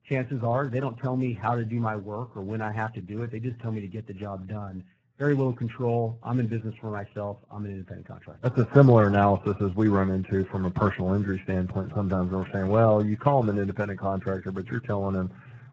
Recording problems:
garbled, watery; badly

